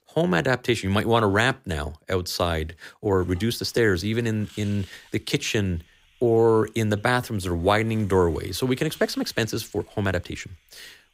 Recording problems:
hiss; faint; from 3 s on; 30 dB below the speech
uneven, jittery; strongly; from 3 to 10 s

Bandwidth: 15.5 kHz